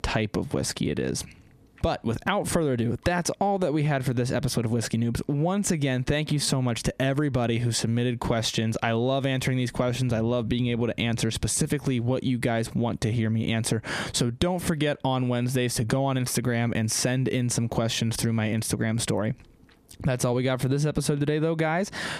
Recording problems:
squashed, flat; heavily

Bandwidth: 14.5 kHz